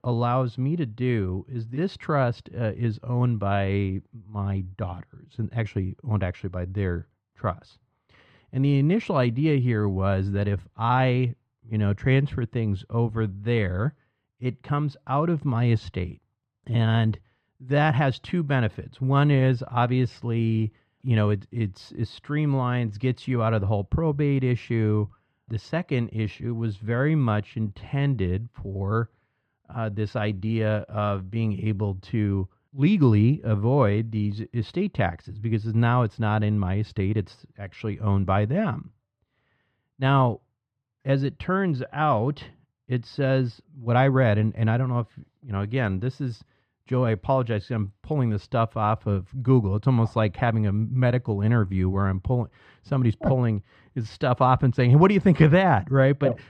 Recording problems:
muffled; very; fading above 3 kHz

